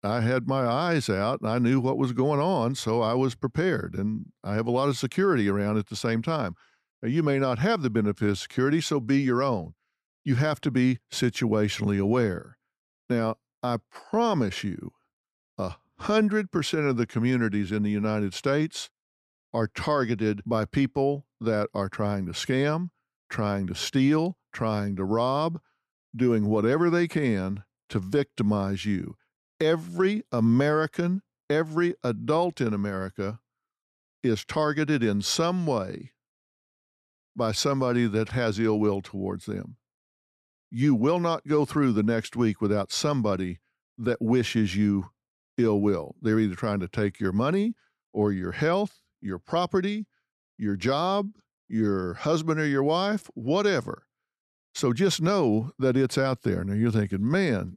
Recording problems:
none

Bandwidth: 13.5 kHz